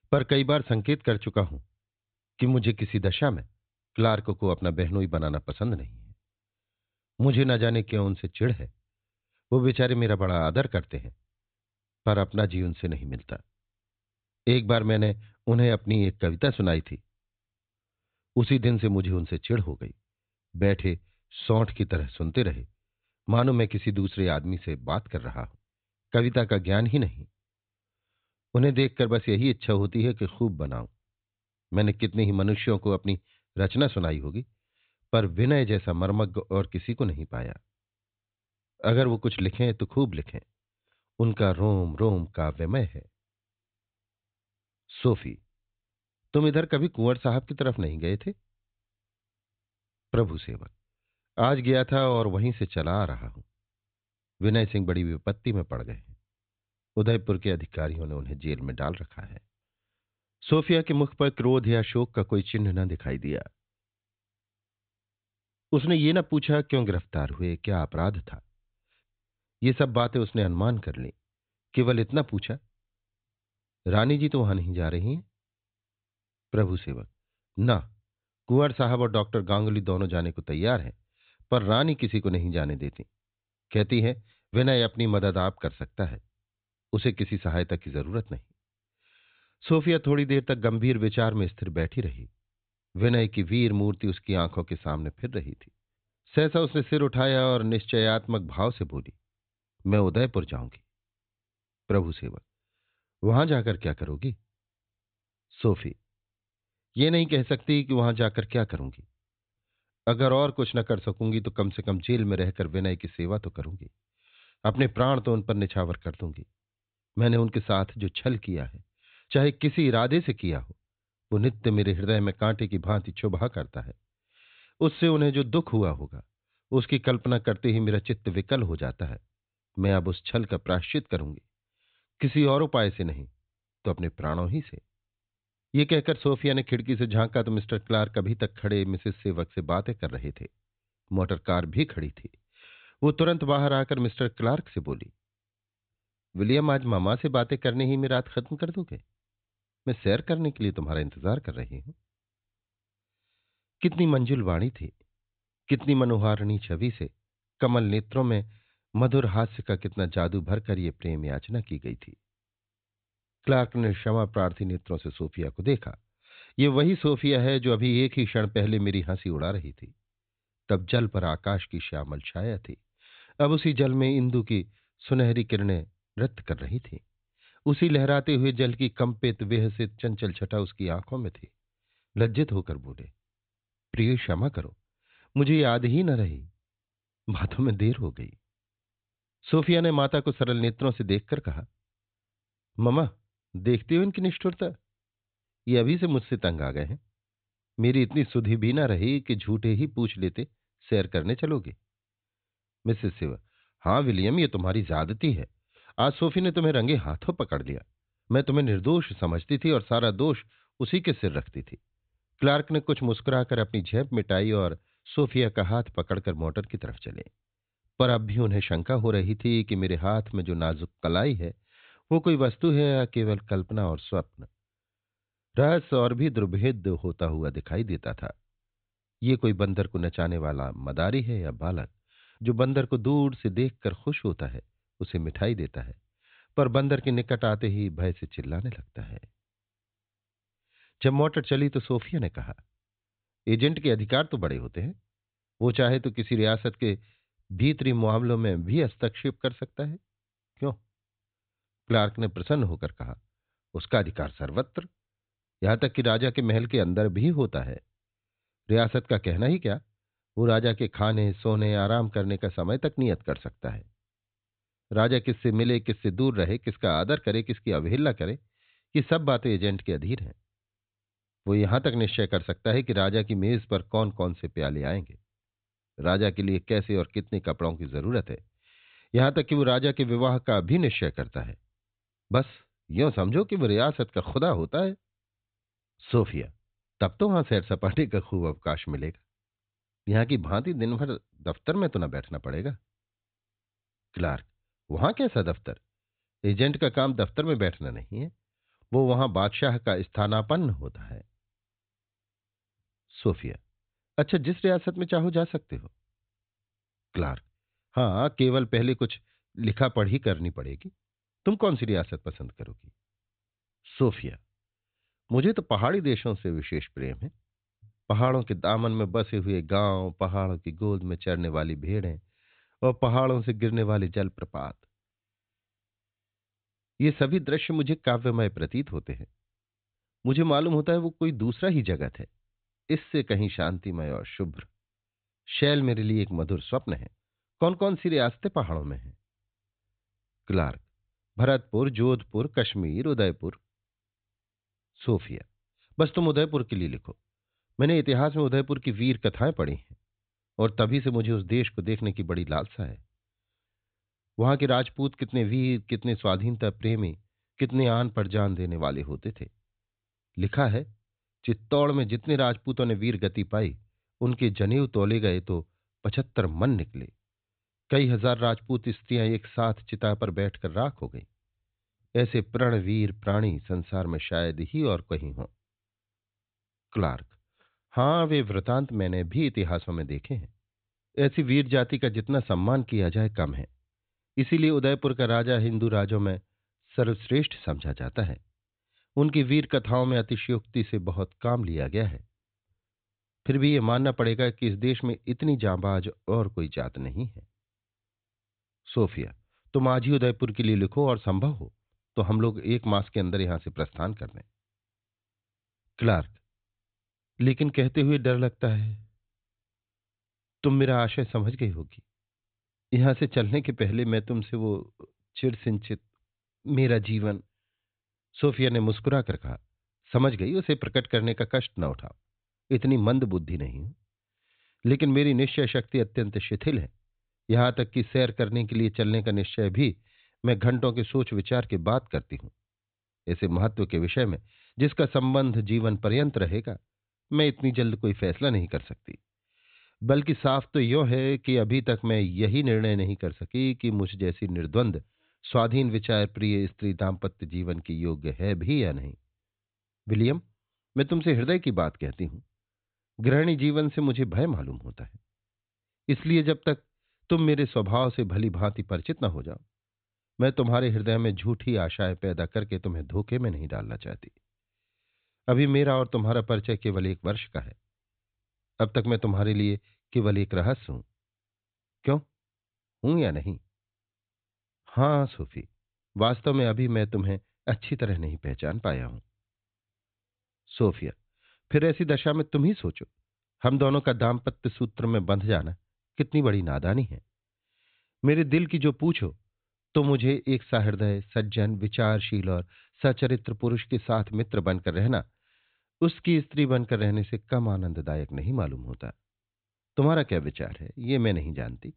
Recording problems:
high frequencies cut off; severe; nothing above 4 kHz

